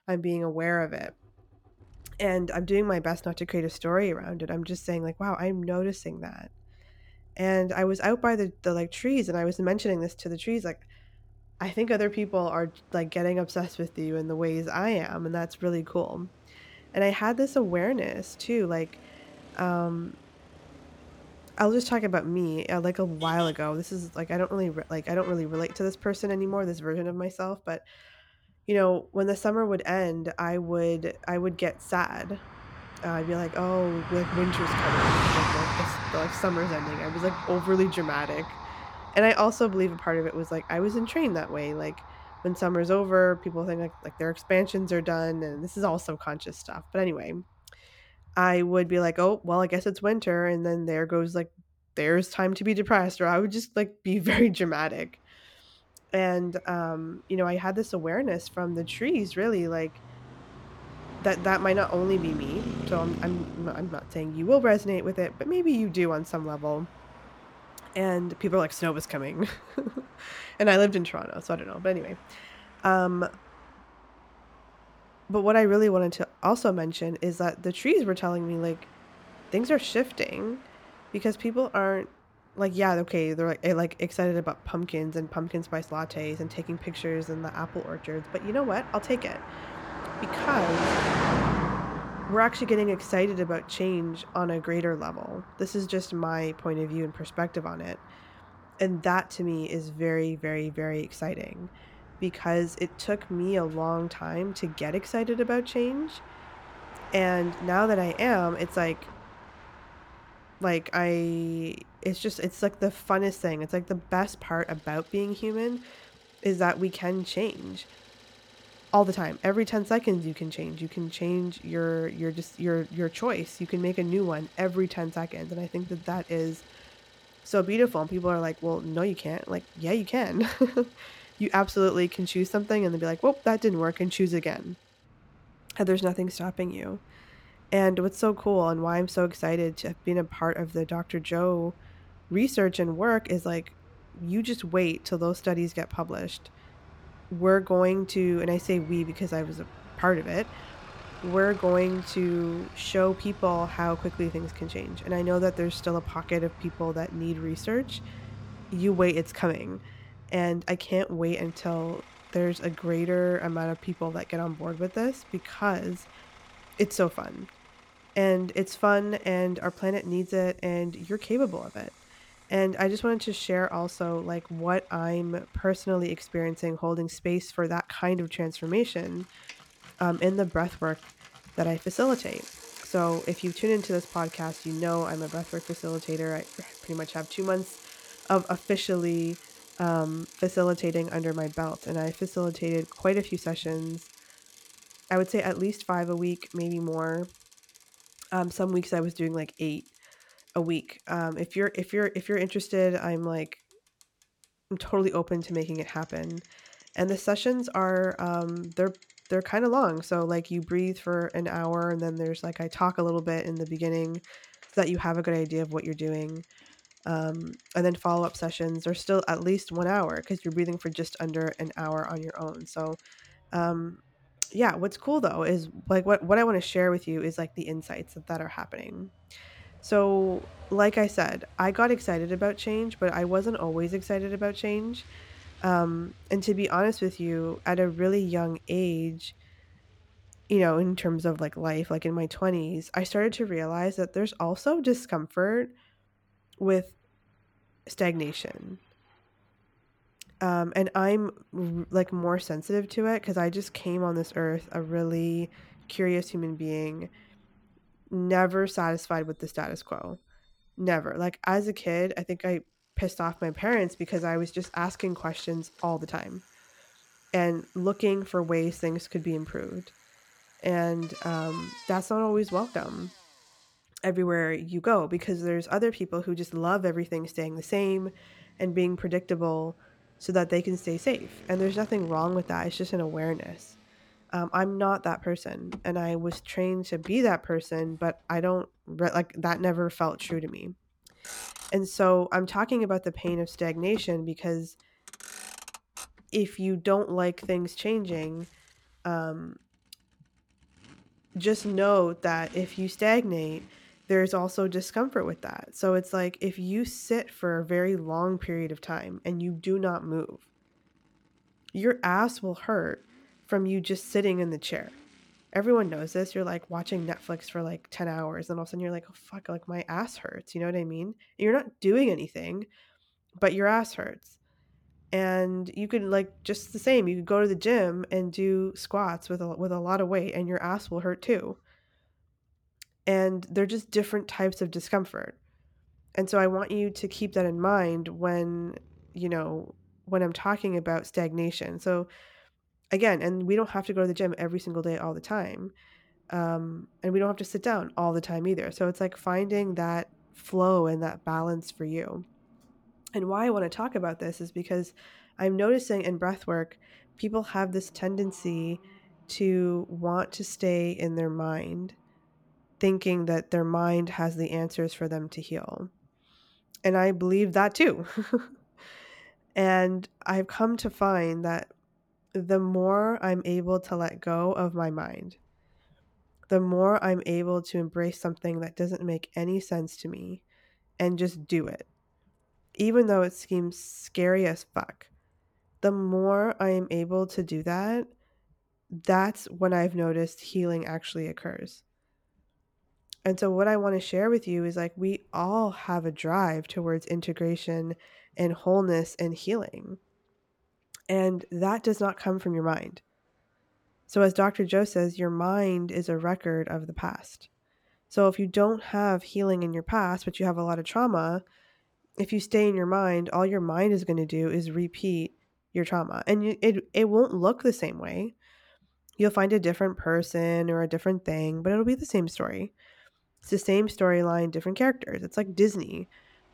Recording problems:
traffic noise; noticeable; throughout; 15 dB below the speech

